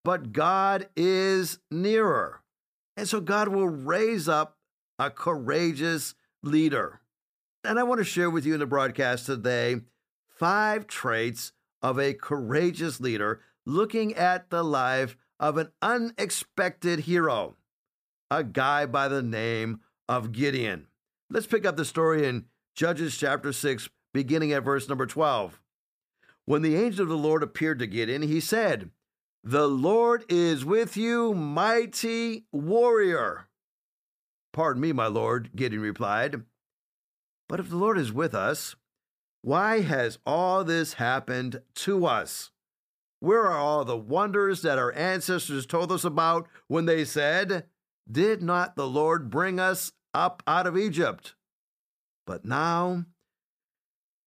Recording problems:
none

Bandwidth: 15 kHz